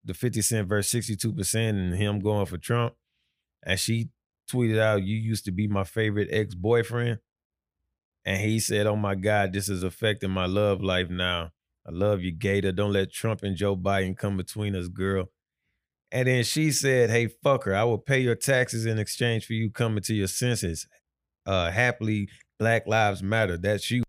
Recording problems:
none

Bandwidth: 15 kHz